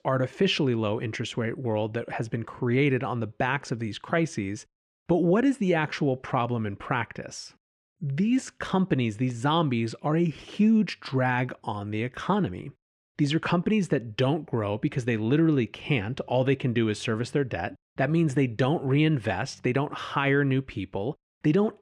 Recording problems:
muffled; slightly; fading above 3 kHz

